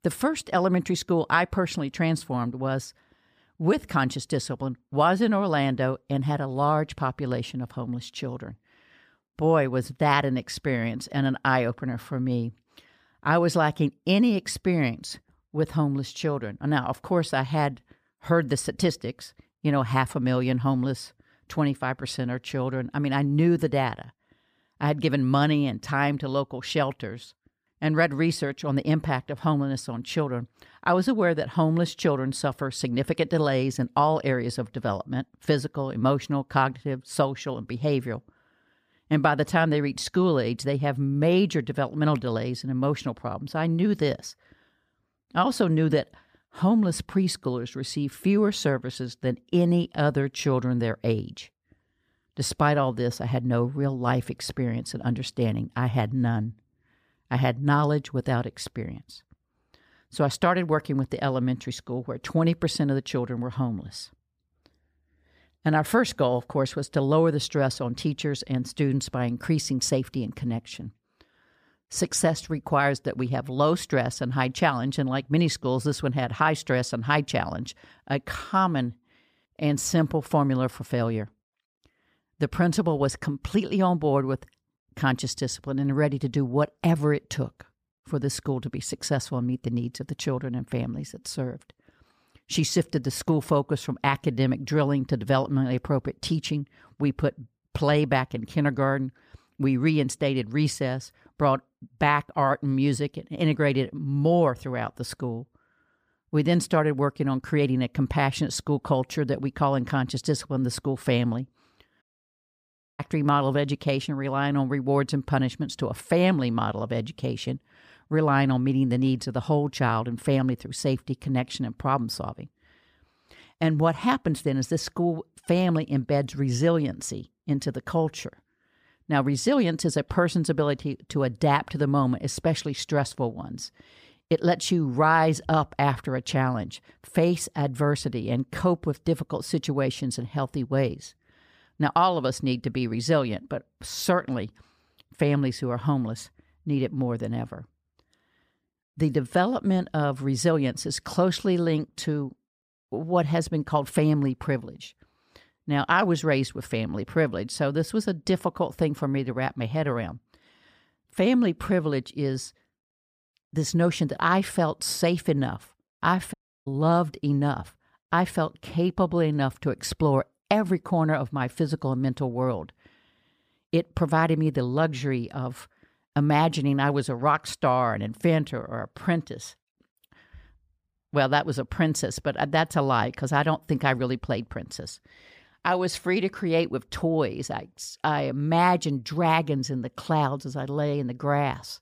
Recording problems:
audio cutting out; at 1:52 for 1 s and at 2:46

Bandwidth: 15 kHz